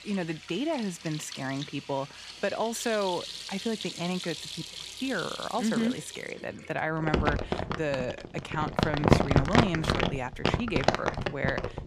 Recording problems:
household noises; very loud; throughout; 1 dB above the speech

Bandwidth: 15 kHz